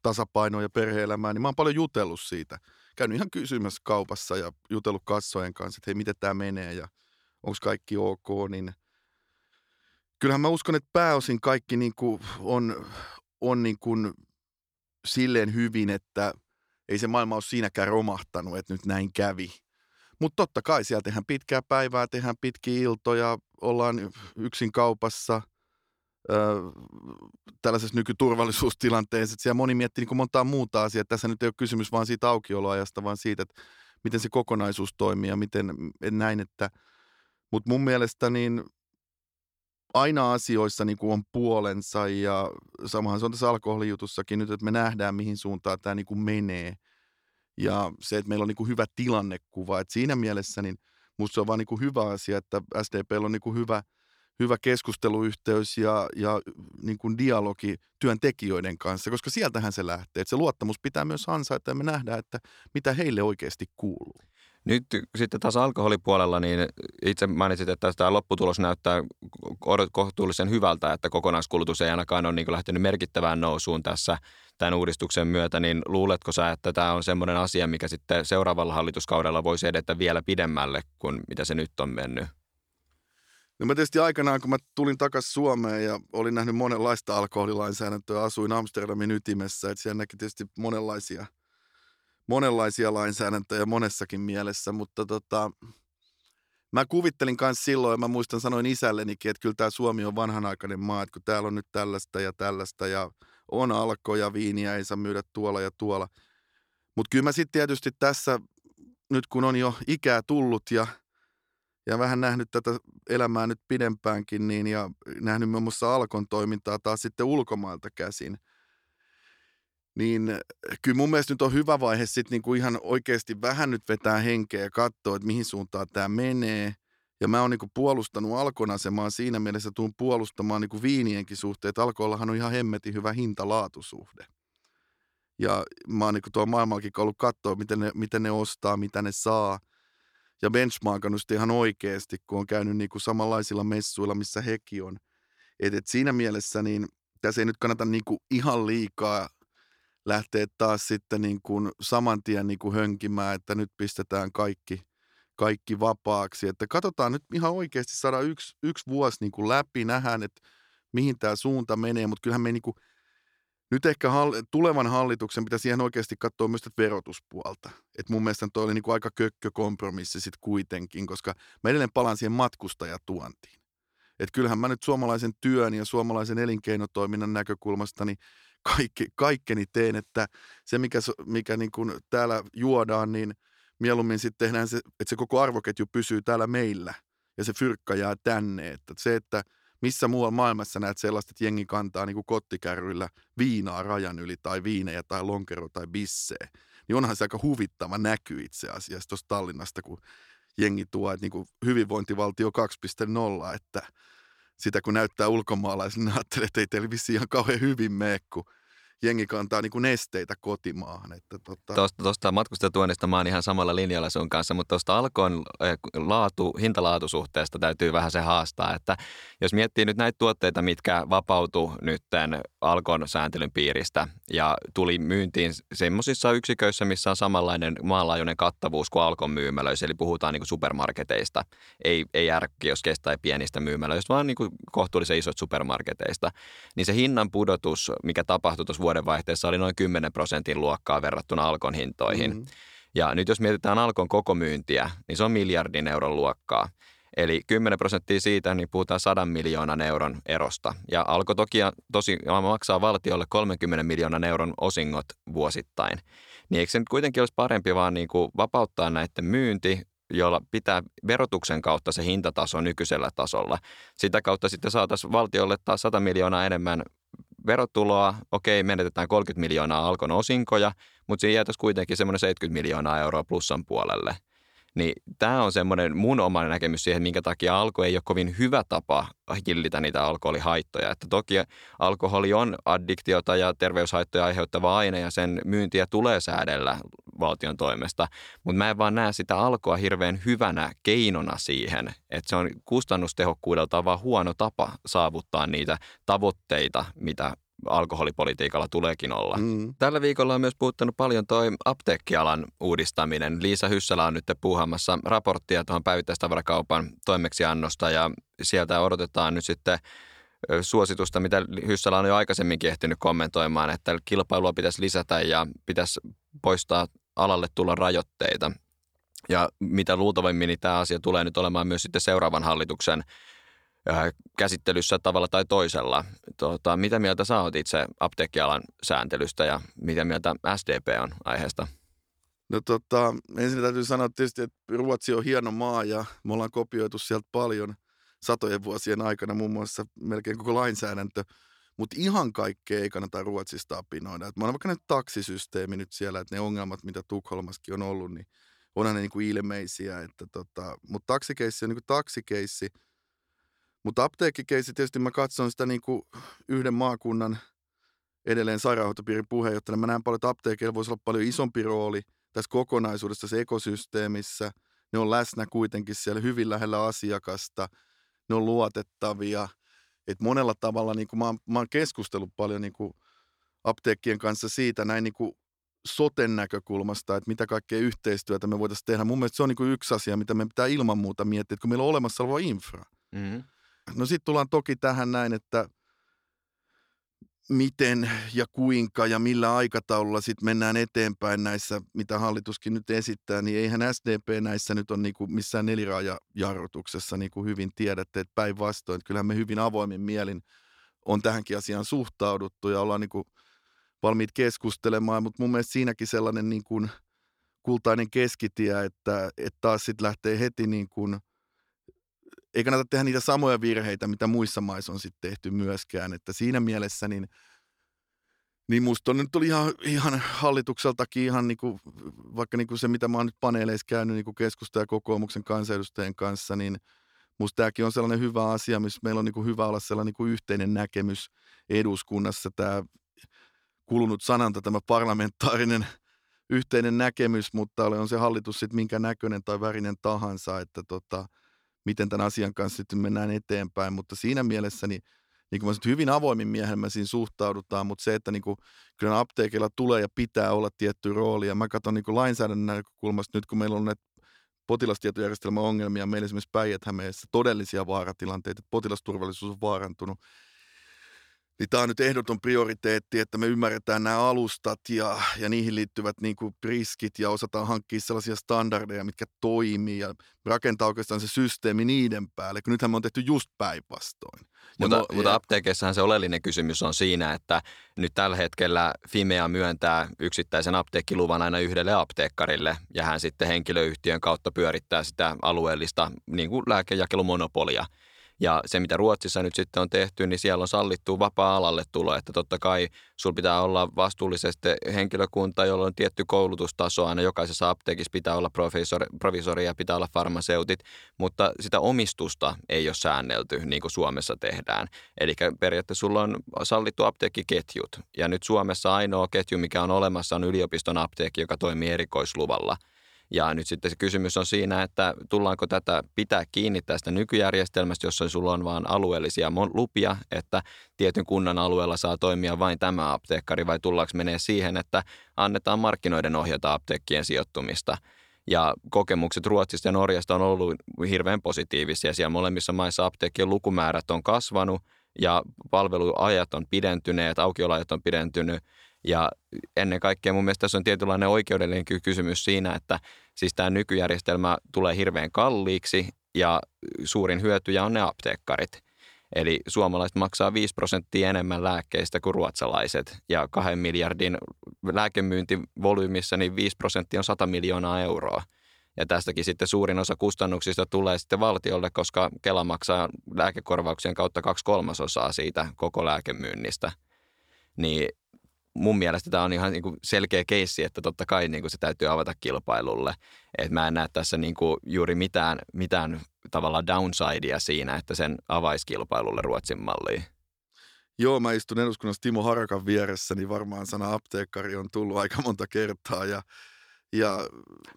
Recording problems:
none

